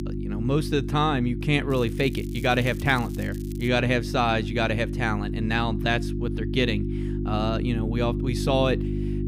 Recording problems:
electrical hum; noticeable; throughout; 50 Hz, 10 dB below the speech
crackling; faint; from 1.5 to 3.5 s; 20 dB below the speech

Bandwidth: 15.5 kHz